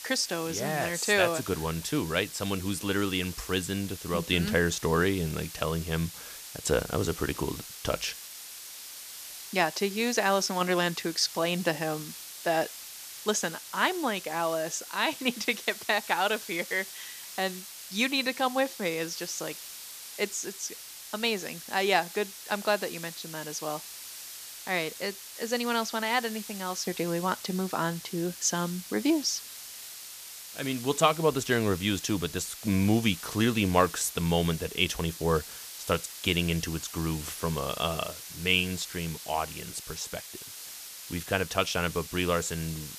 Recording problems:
hiss; noticeable; throughout; 10 dB below the speech

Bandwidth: 14.5 kHz